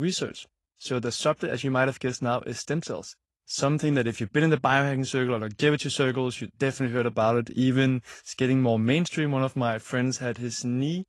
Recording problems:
garbled, watery; slightly
abrupt cut into speech; at the start

